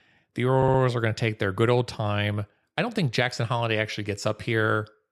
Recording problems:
audio stuttering; at 0.5 s

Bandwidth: 13.5 kHz